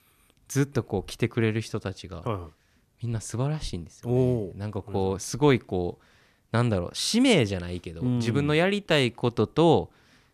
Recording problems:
none

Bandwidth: 14.5 kHz